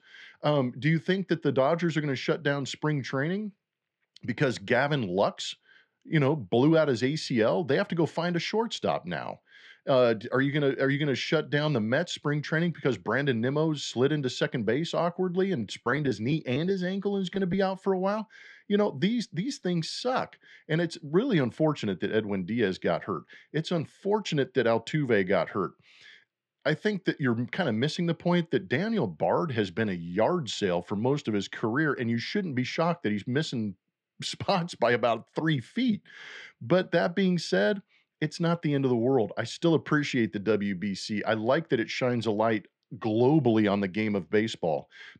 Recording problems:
muffled; slightly; fading above 3.5 kHz
choppy; very; from 16 to 18 s; 5% of the speech affected

